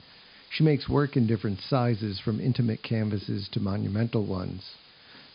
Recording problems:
high frequencies cut off; noticeable; nothing above 5 kHz
hiss; faint; throughout; 25 dB below the speech

